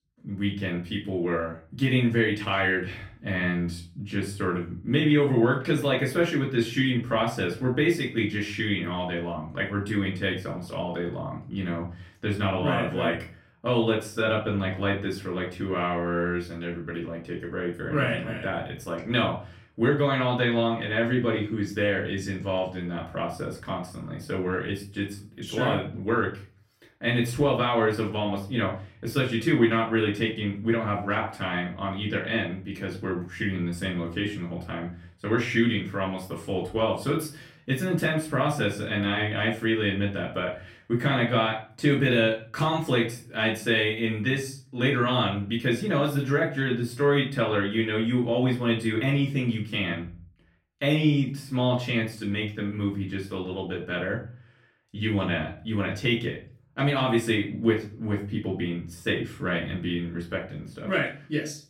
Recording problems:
off-mic speech; far
room echo; slight; dies away in 0.4 s

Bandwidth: 16 kHz